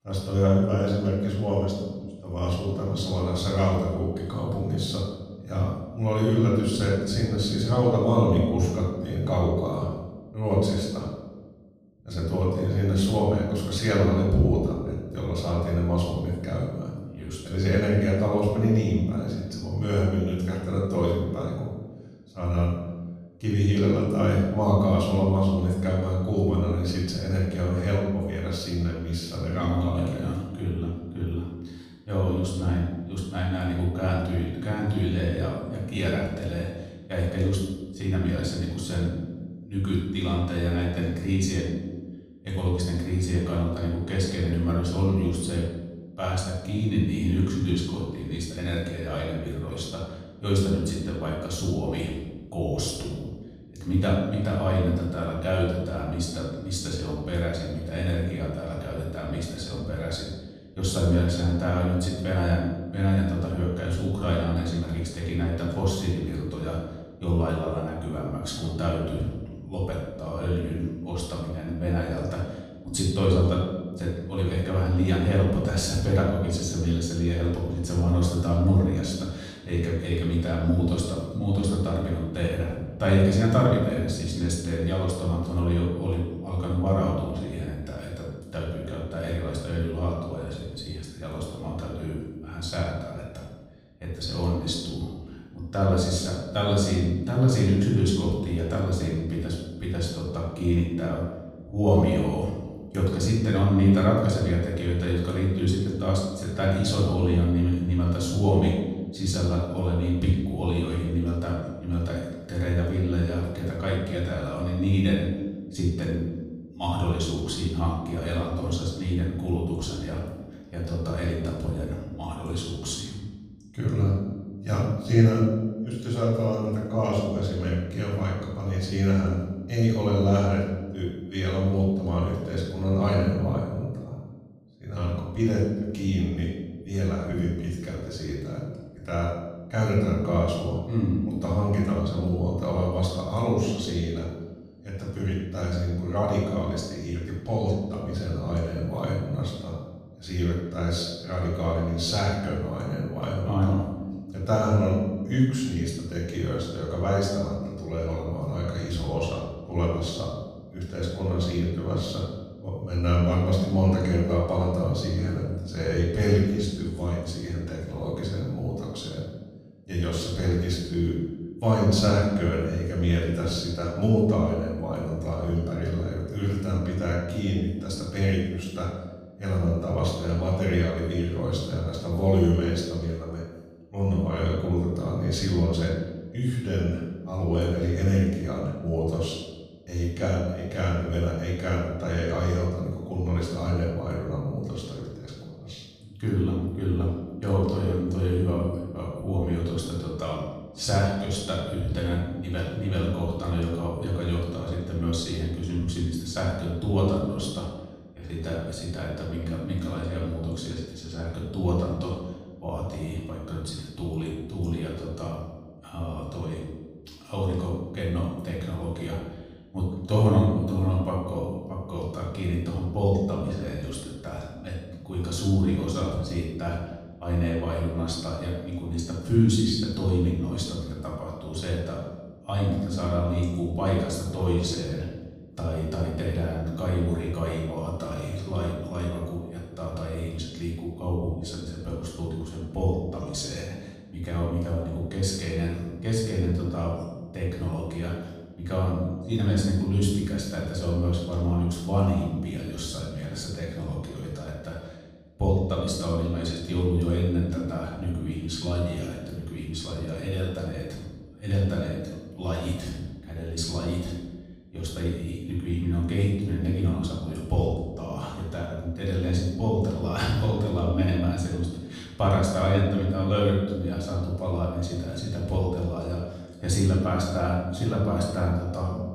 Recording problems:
off-mic speech; far
room echo; noticeable; dies away in 1.2 s

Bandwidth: 15 kHz